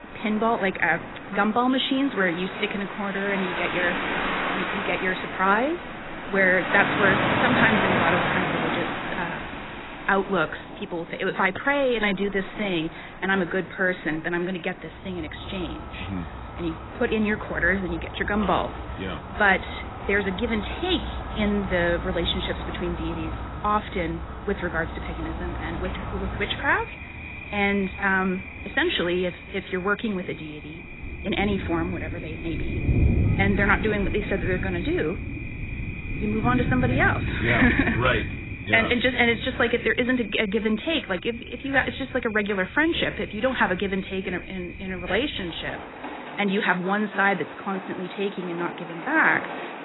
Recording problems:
garbled, watery; badly; nothing above 4 kHz
rain or running water; loud; throughout; 6 dB below the speech

